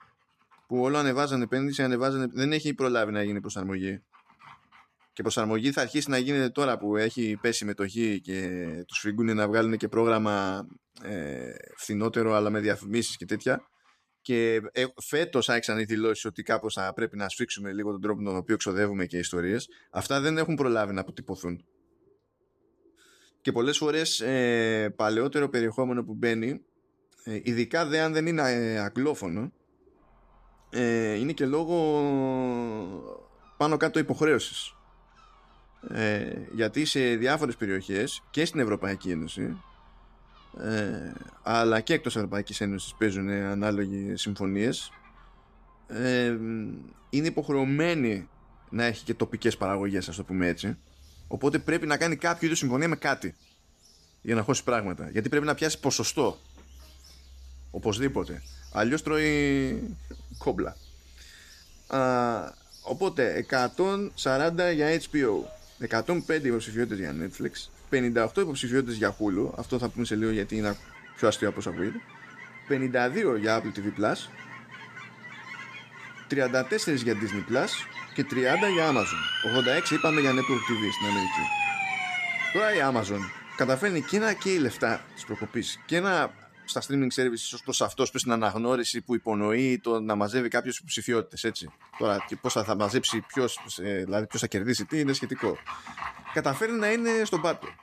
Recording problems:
animal sounds; noticeable; throughout; 15 dB below the speech
siren; loud; from 1:18 to 1:23; peak 2 dB above the speech

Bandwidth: 14.5 kHz